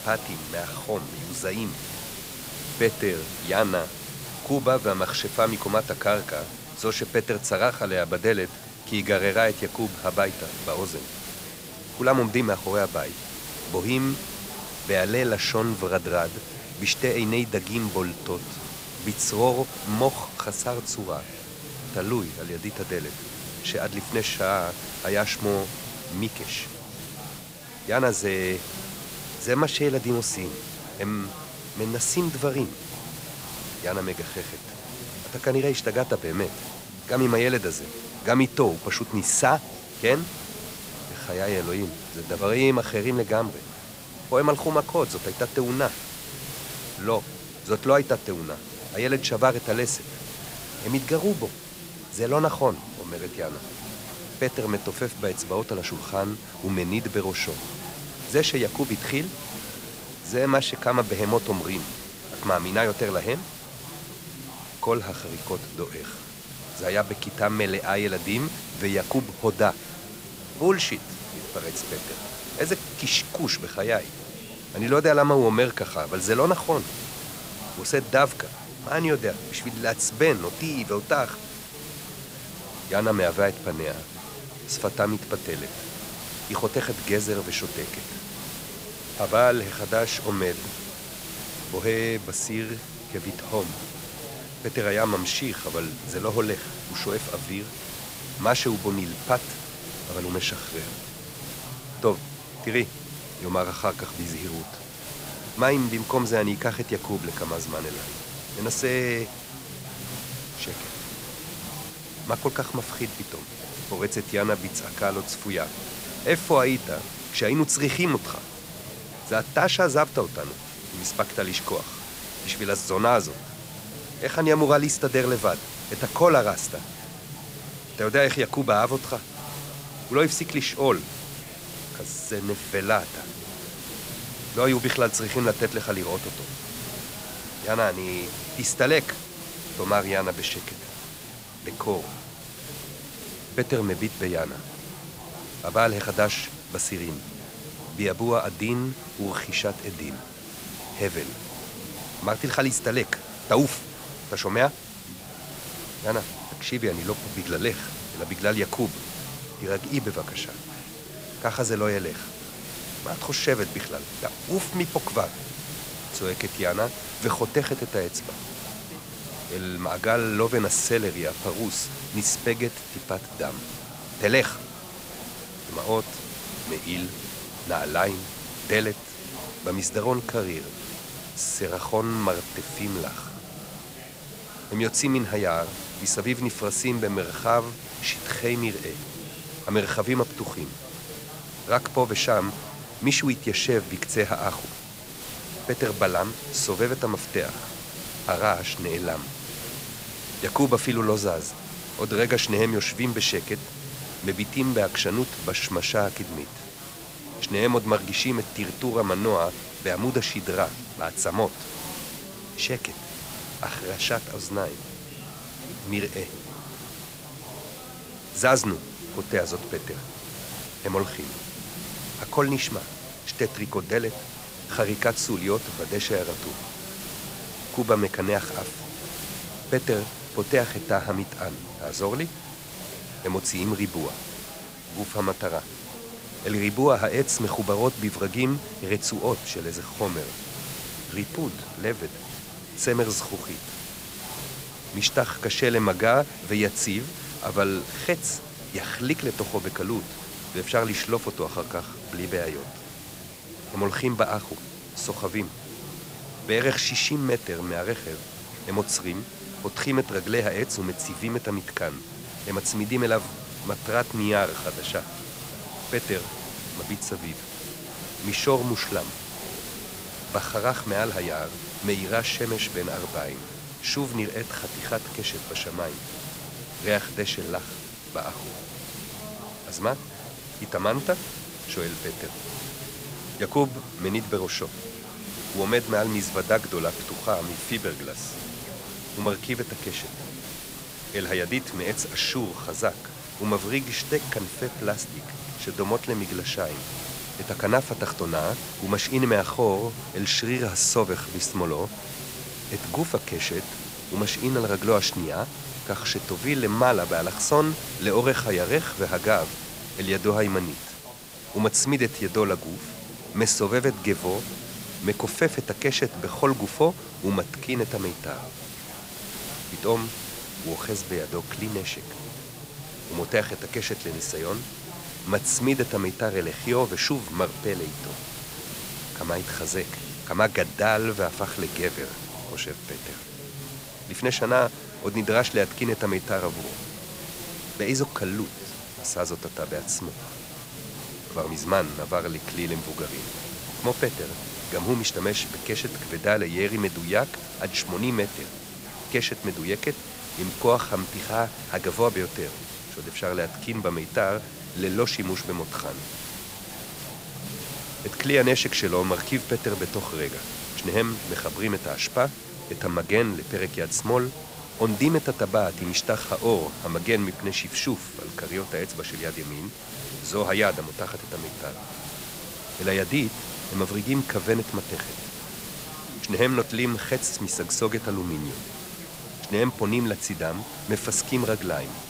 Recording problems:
chatter from many people; noticeable; throughout; 15 dB below the speech
hiss; noticeable; throughout; 10 dB below the speech

